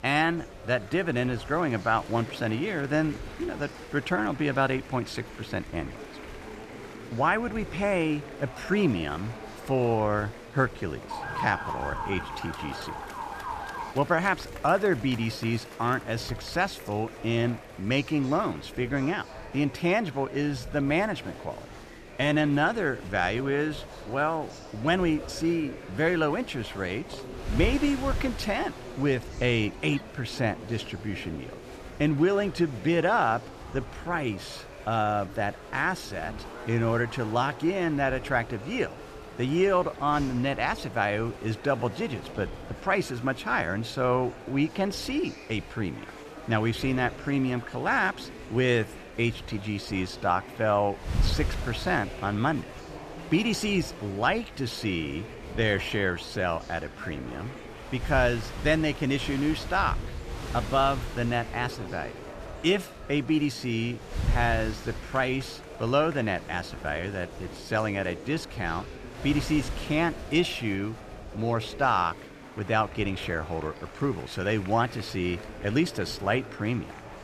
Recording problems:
murmuring crowd; noticeable; throughout; 15 dB below the speech
wind noise on the microphone; occasional gusts; 20 dB below the speech
siren; noticeable; from 11 to 14 s; peak 4 dB below the speech

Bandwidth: 14.5 kHz